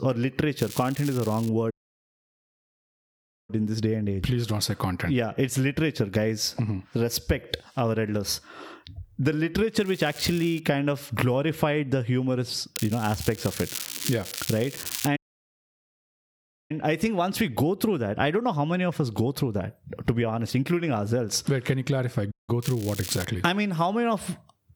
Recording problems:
squashed, flat; somewhat
crackling; loud; 4 times, first at 0.5 s; 9 dB below the speech
audio cutting out; at 1.5 s for 2 s, at 15 s for 1.5 s and at 22 s

